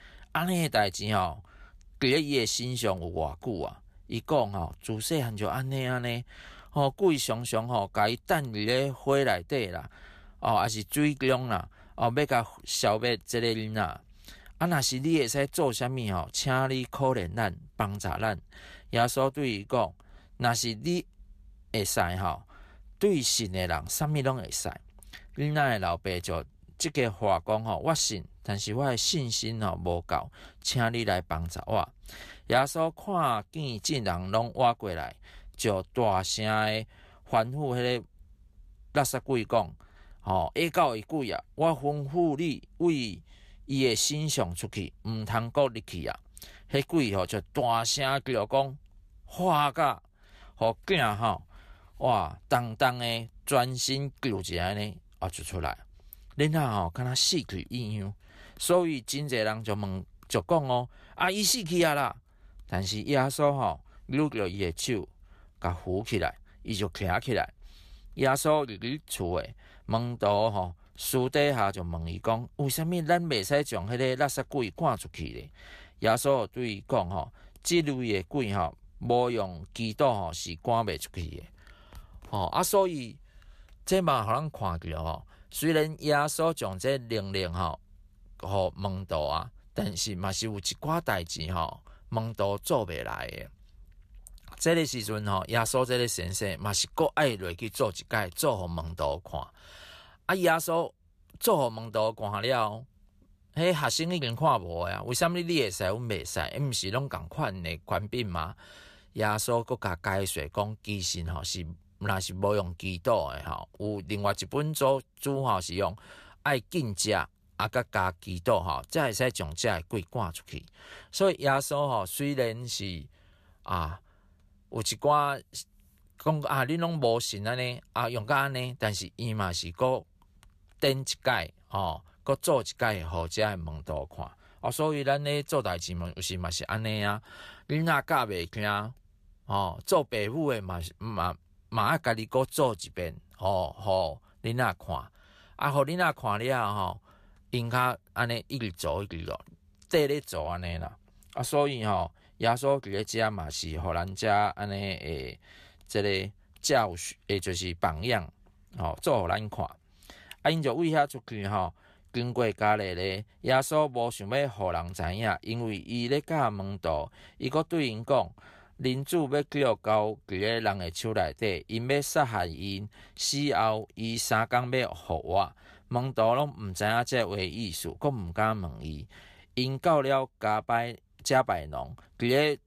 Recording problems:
none

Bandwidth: 14.5 kHz